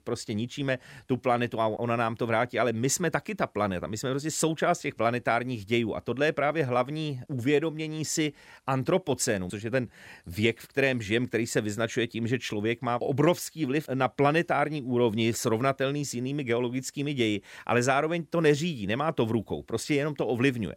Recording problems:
none

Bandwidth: 16 kHz